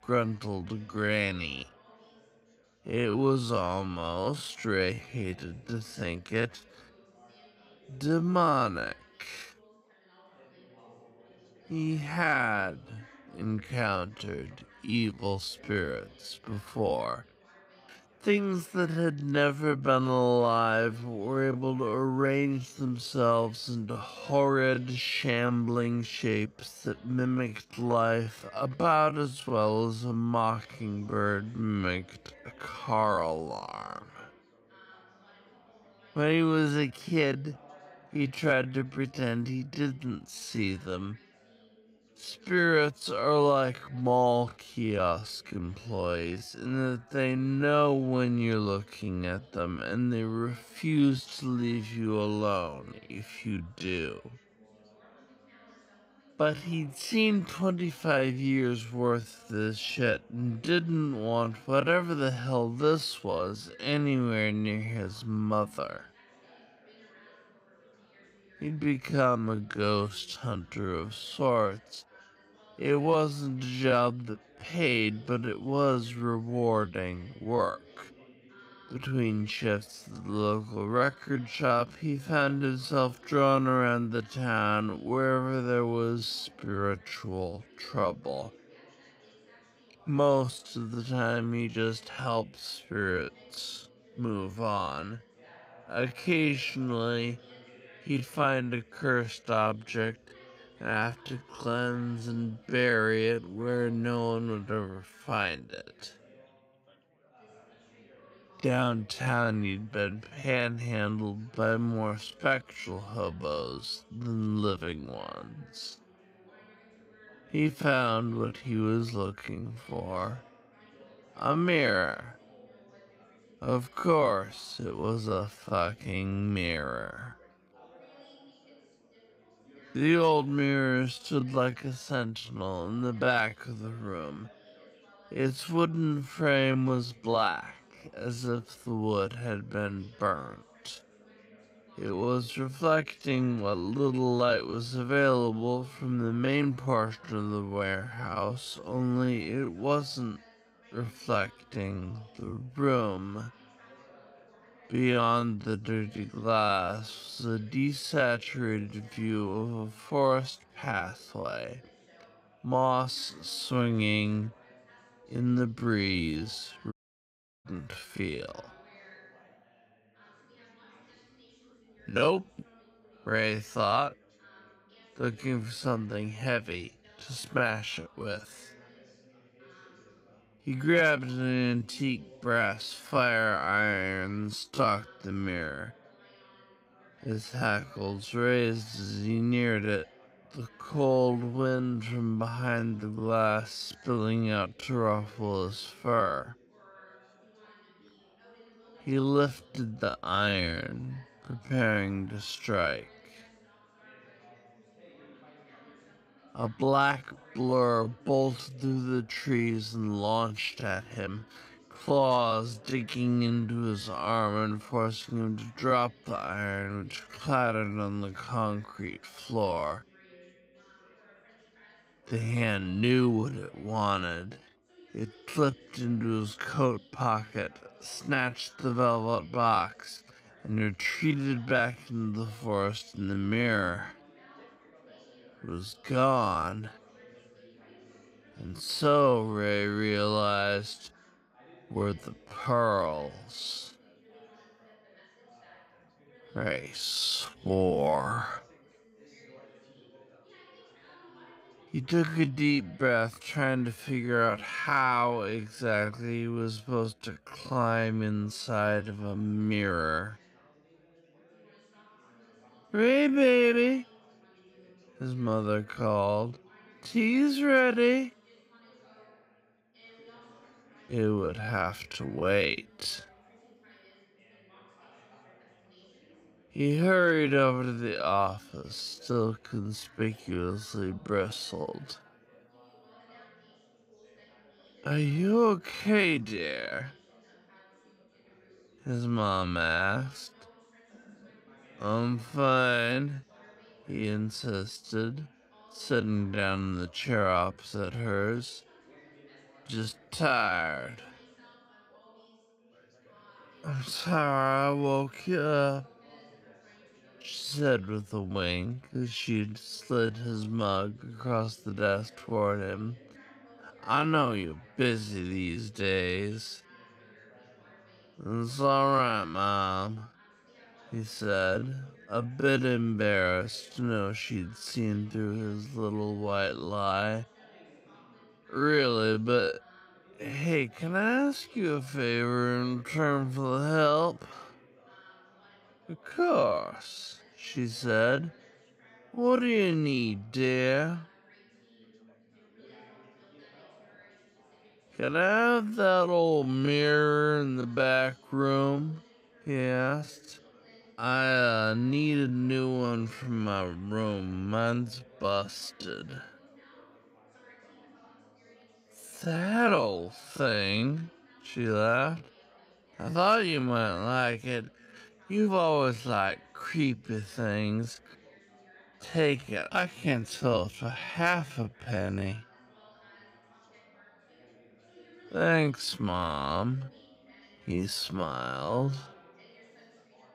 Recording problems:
wrong speed, natural pitch; too slow; 0.5 times normal speed
background chatter; faint; throughout; 4 voices, 25 dB below the speech
audio cutting out; at 2:47 for 0.5 s

